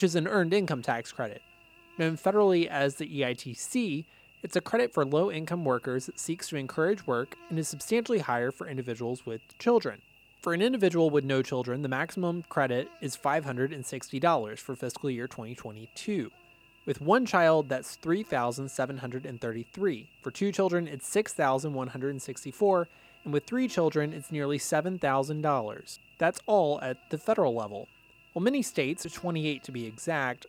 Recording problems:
electrical hum; faint; throughout; 50 Hz, 25 dB below the speech
abrupt cut into speech; at the start

